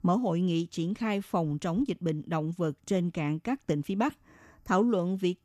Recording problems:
none

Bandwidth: 14 kHz